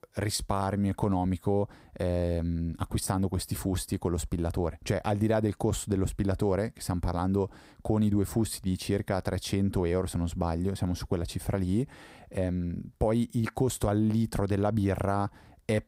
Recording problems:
none

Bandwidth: 15.5 kHz